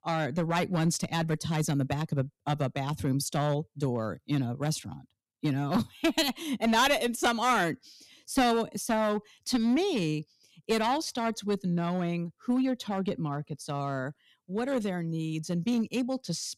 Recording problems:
distortion; slight; 4% of the sound clipped

